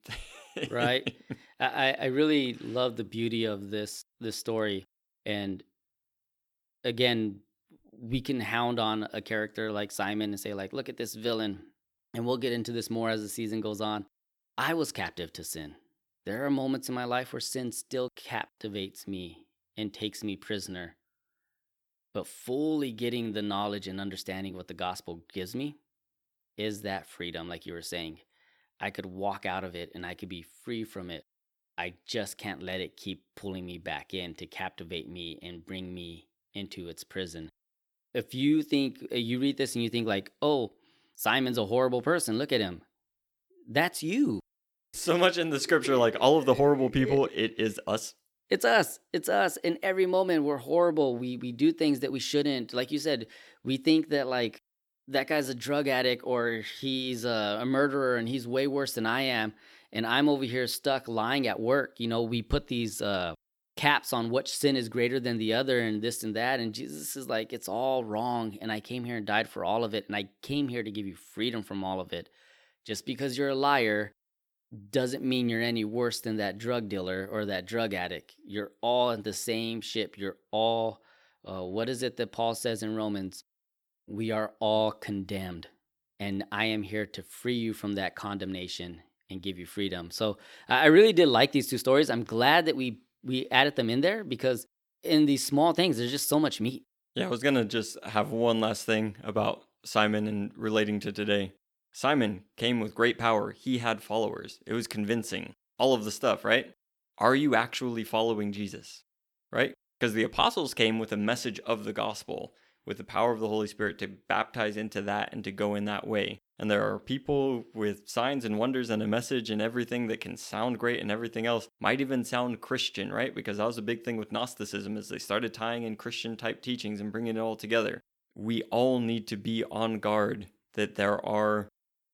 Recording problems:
none

